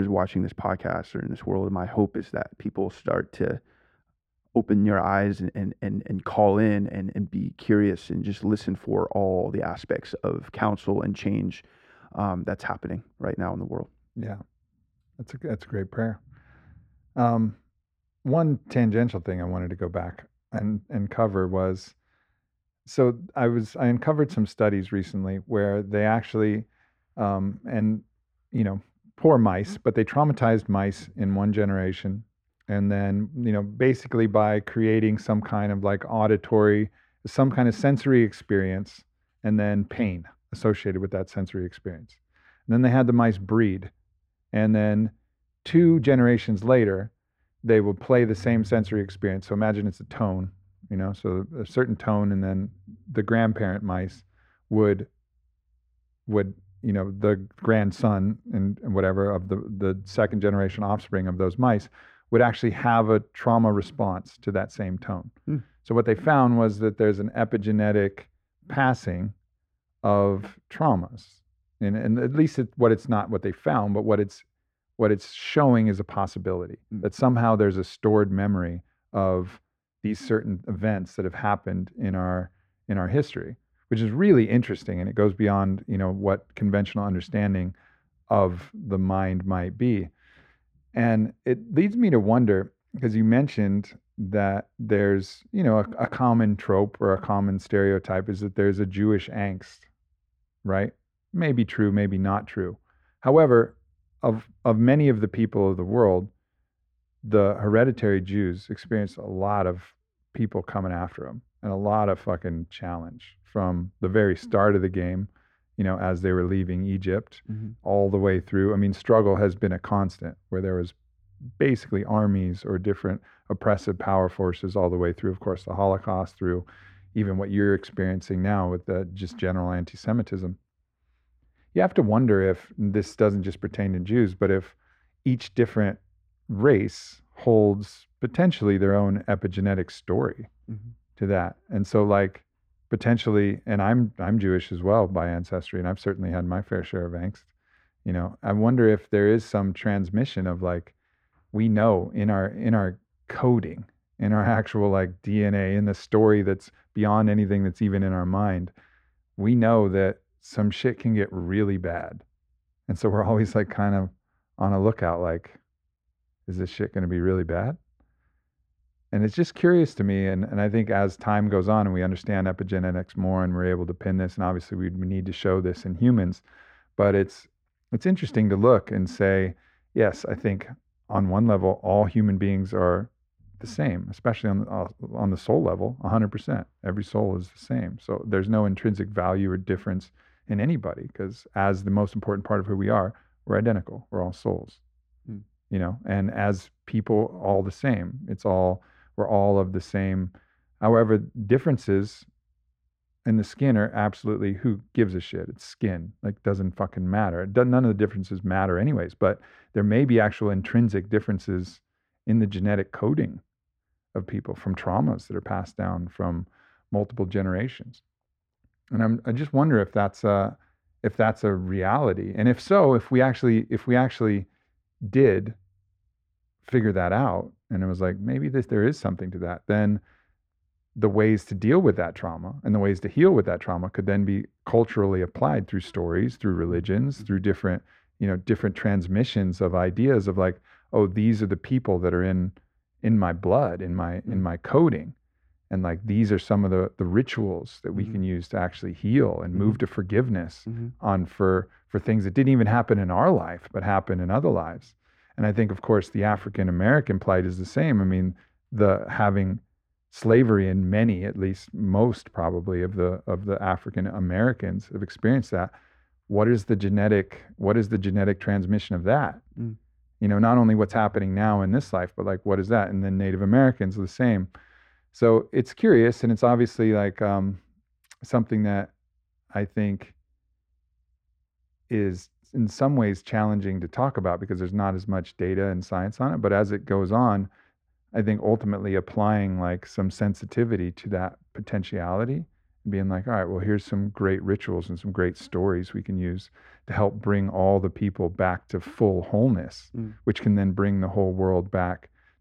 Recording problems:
muffled; very; fading above 3.5 kHz
abrupt cut into speech; at the start

